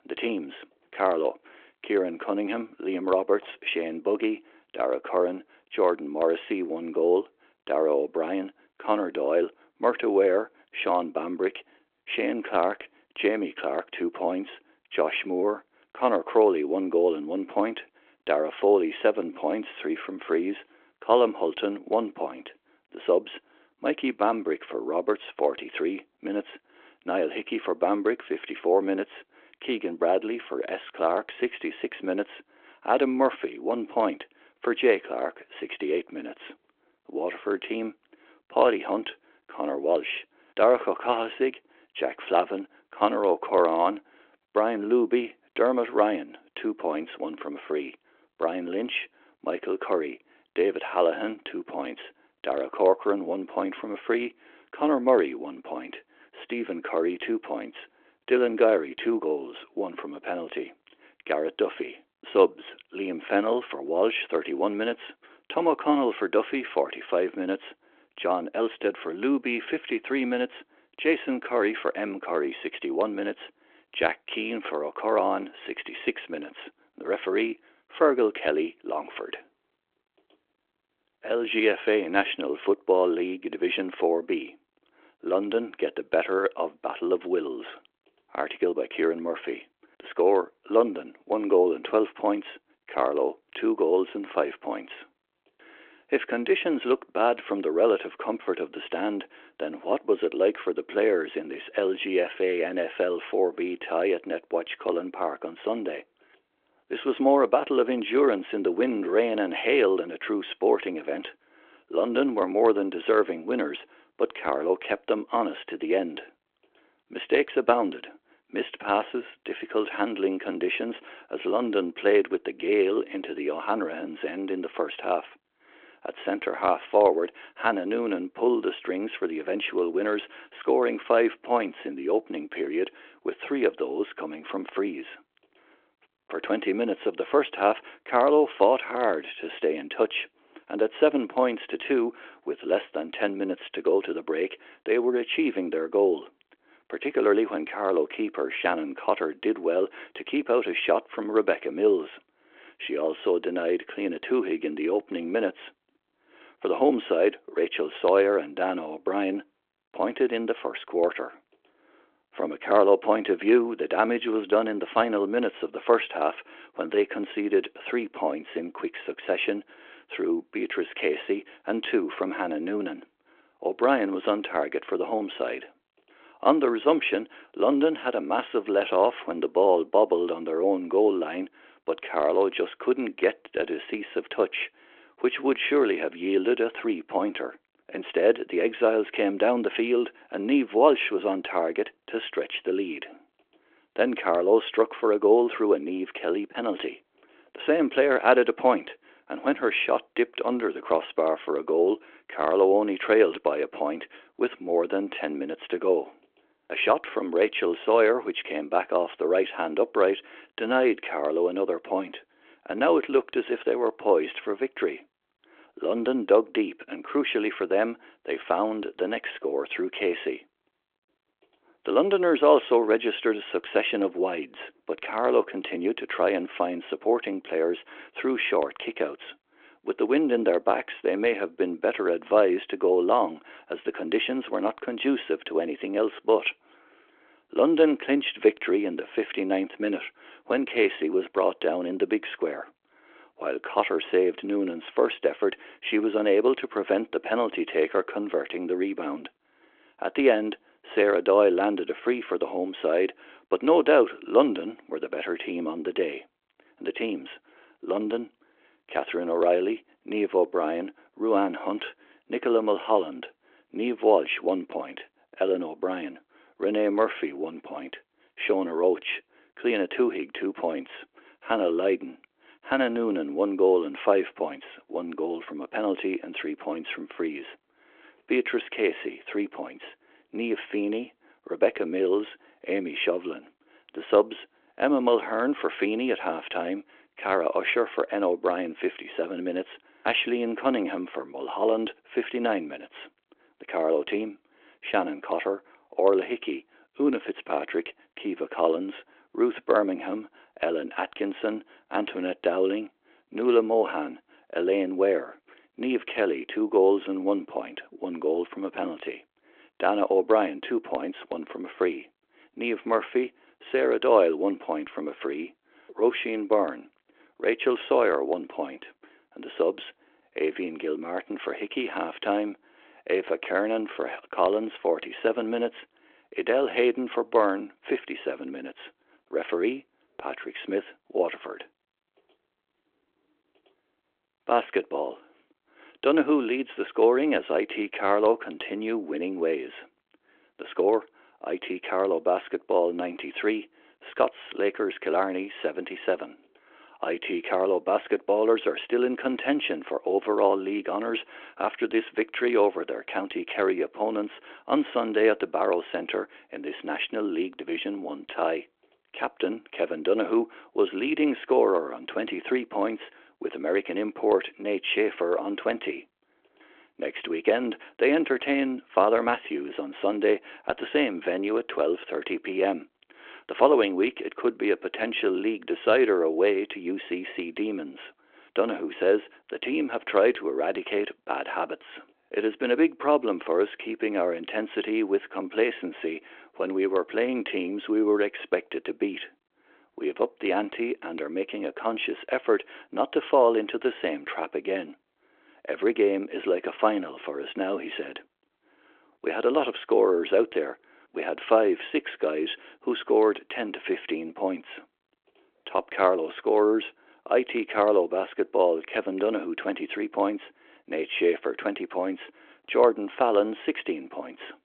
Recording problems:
phone-call audio

